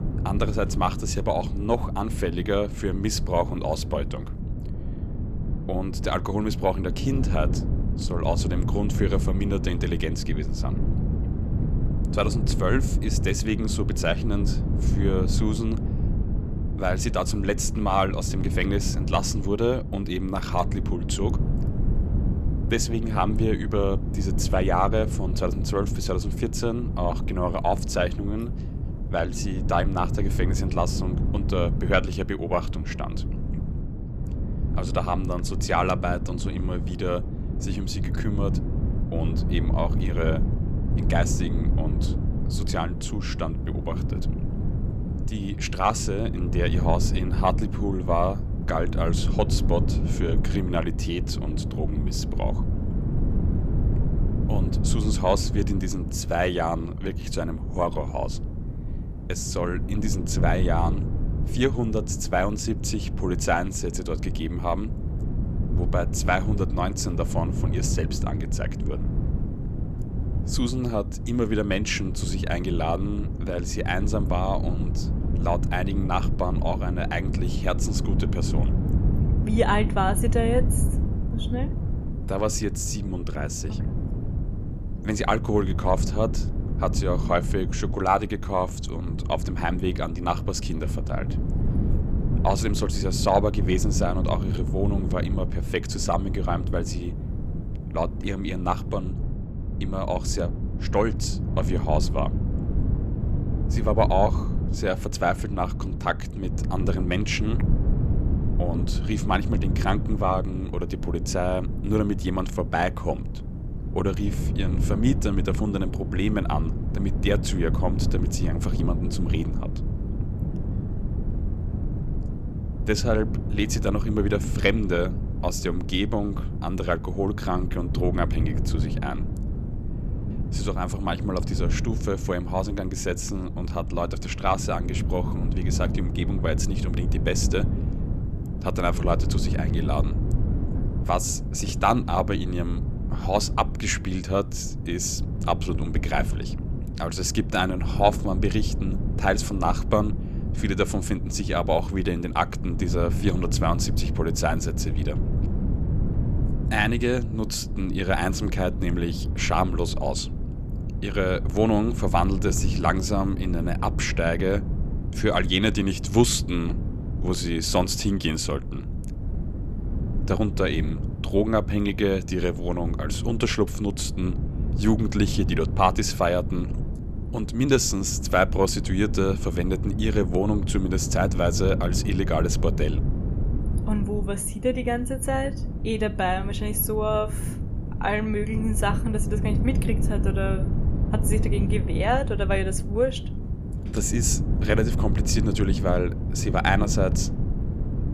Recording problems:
wind noise on the microphone; occasional gusts; 10 dB below the speech

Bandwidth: 14.5 kHz